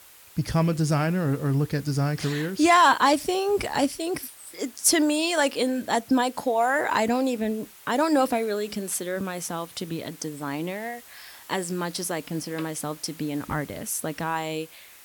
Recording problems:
hiss; faint; throughout; 20 dB below the speech

